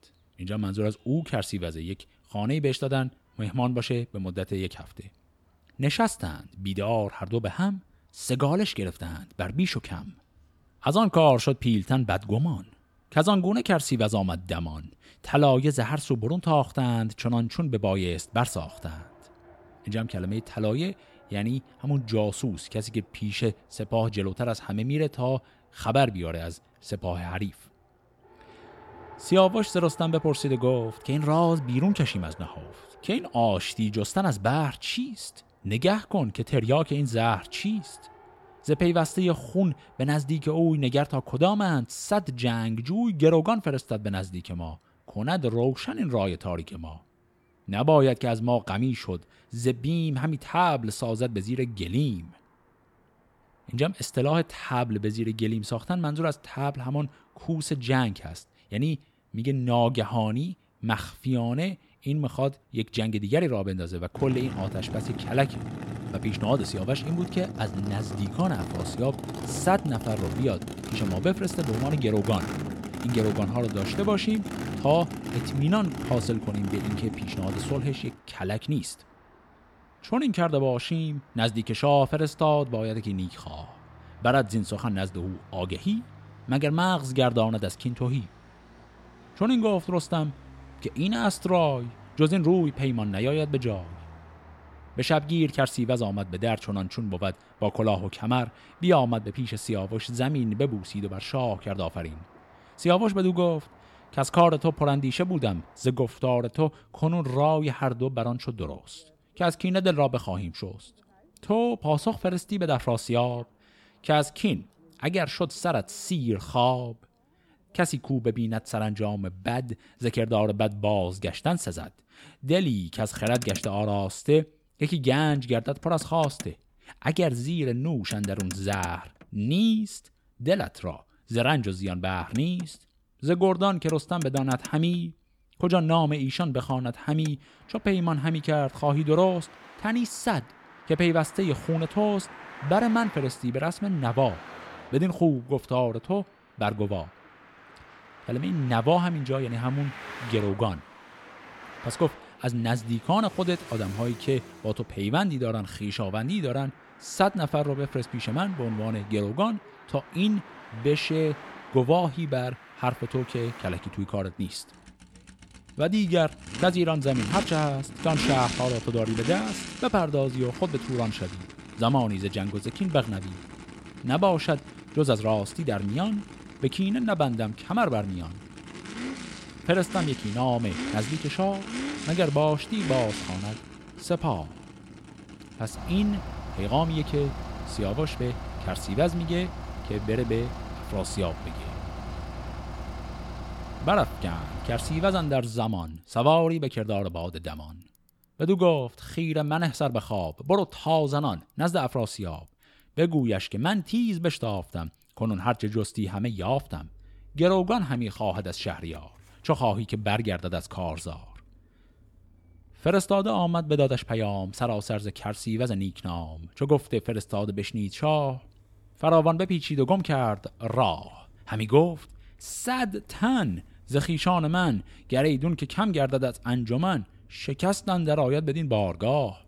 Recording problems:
traffic noise; noticeable; throughout; 10 dB below the speech

